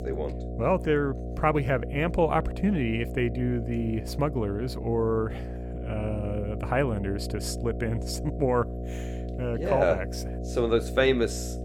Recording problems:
electrical hum; noticeable; throughout; 60 Hz, 10 dB below the speech

